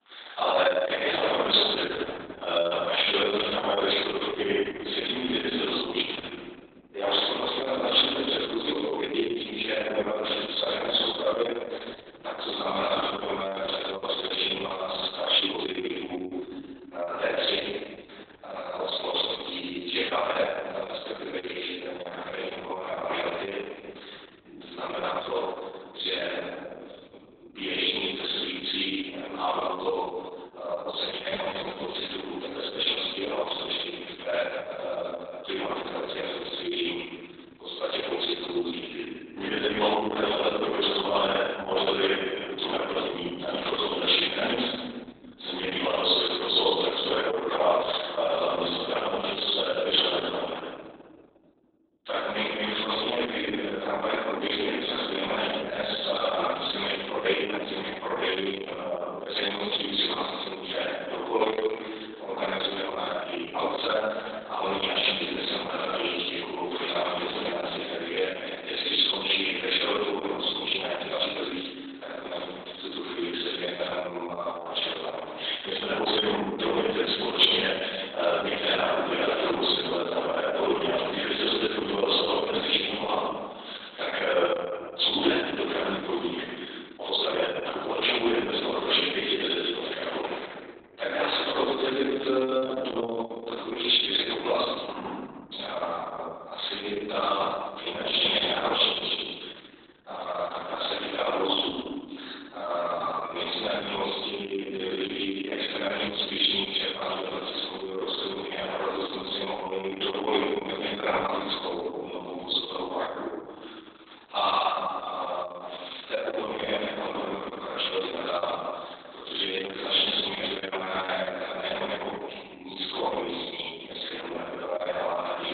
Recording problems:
room echo; strong; dies away in 1.7 s
off-mic speech; far
garbled, watery; badly; nothing above 4 kHz
thin; somewhat; fading below 300 Hz
uneven, jittery; strongly; from 8.5 s to 1:49

